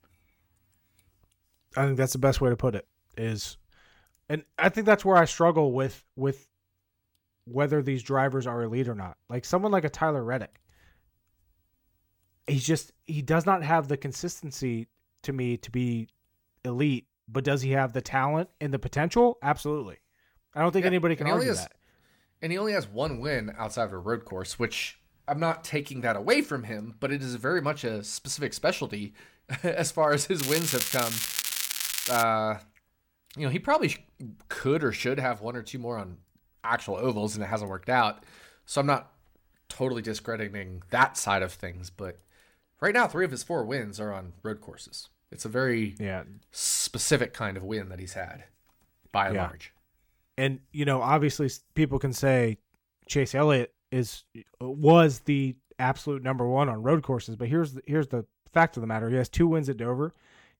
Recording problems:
crackling; loud; from 30 to 32 s; 1 dB below the speech

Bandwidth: 17 kHz